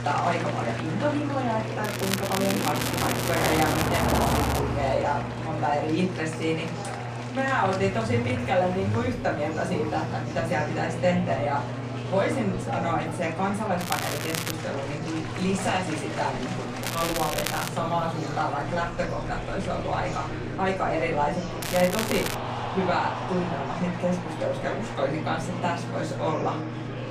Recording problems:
off-mic speech; far
room echo; slight; dies away in 0.3 s
traffic noise; loud; throughout; 8 dB below the speech
murmuring crowd; loud; throughout; 7 dB below the speech
crackling; loud; 4 times, first at 2 s; 3 dB below the speech
electrical hum; noticeable; throughout; 60 Hz, 15 dB below the speech

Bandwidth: 14.5 kHz